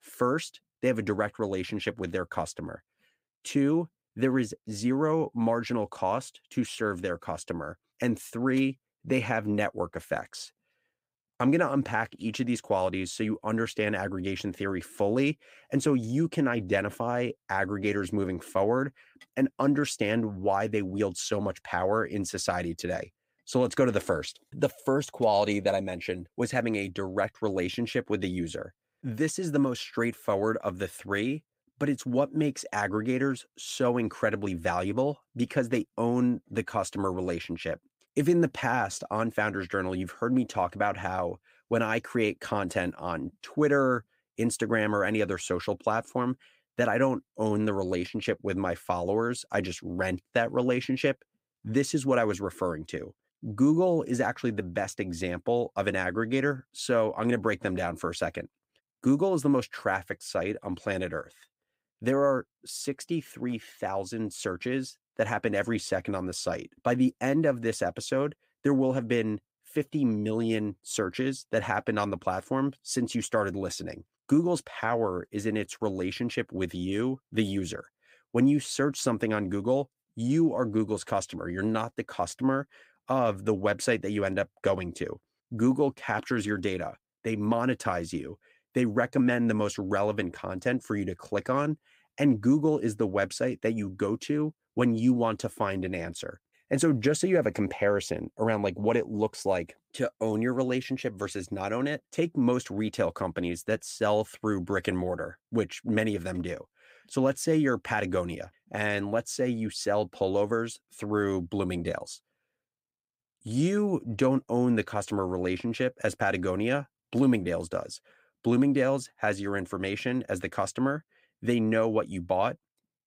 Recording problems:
none

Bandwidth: 15.5 kHz